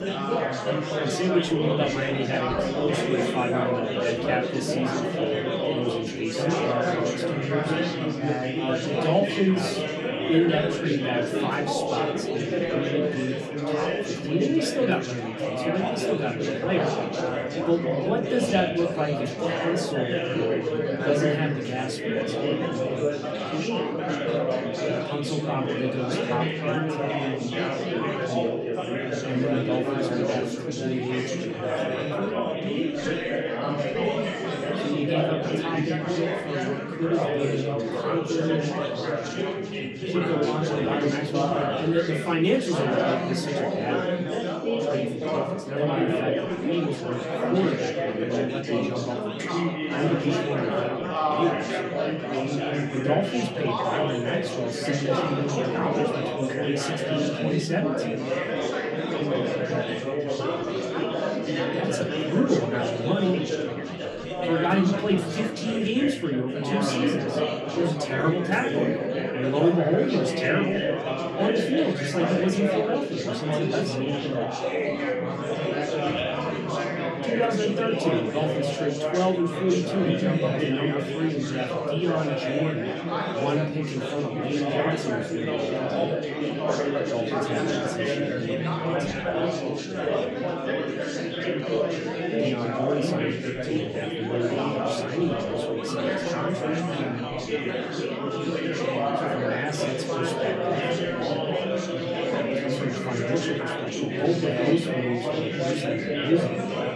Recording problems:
off-mic speech; far
room echo; very slight; dies away in 0.2 s
chatter from many people; very loud; throughout; 1 dB above the speech

